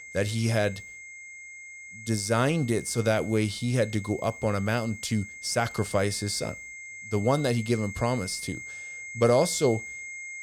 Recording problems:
high-pitched whine; noticeable; throughout; 2 kHz, 10 dB below the speech

